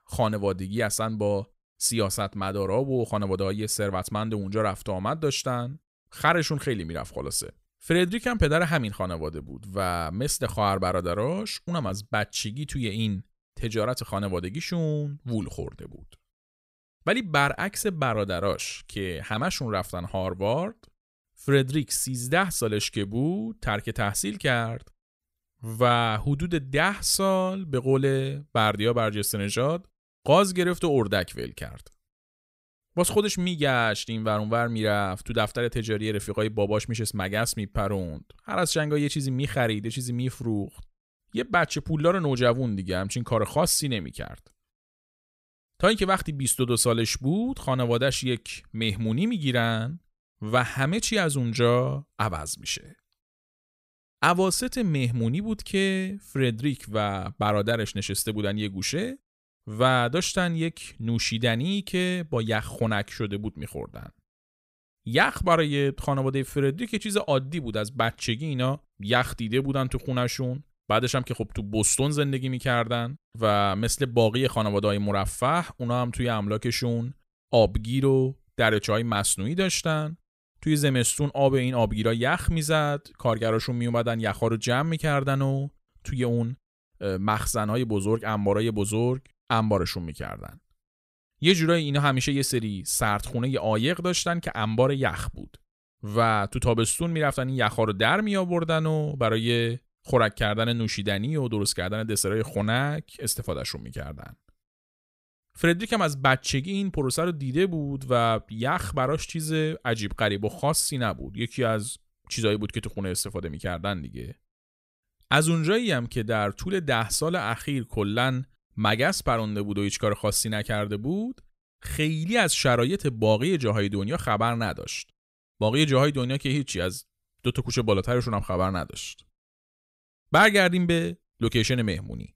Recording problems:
none

